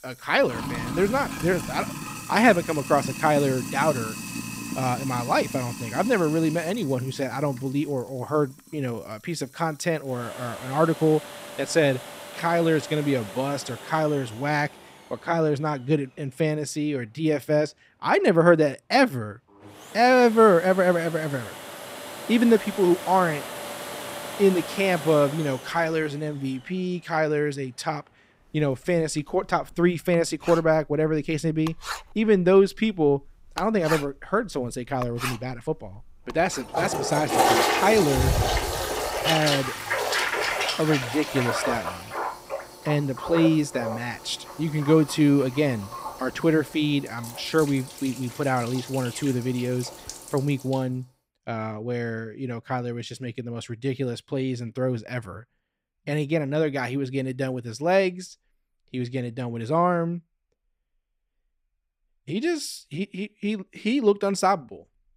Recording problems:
household noises; loud; until 51 s; 6 dB below the speech

